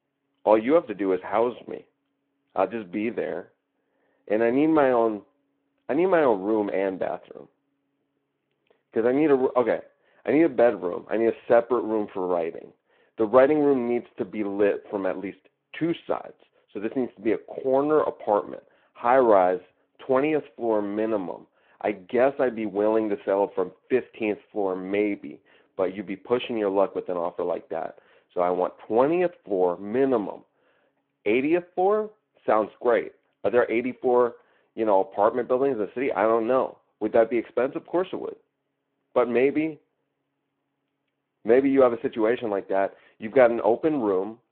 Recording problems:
phone-call audio

